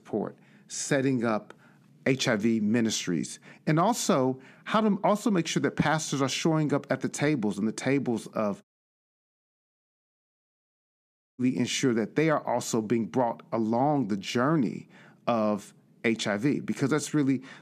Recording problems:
audio cutting out; at 8.5 s for 2.5 s

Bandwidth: 14.5 kHz